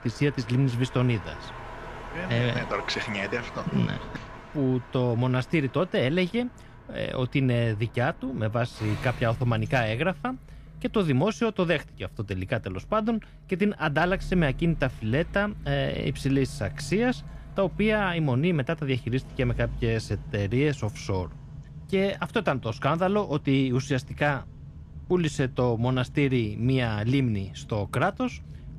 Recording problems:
traffic noise; noticeable; throughout; 15 dB below the speech

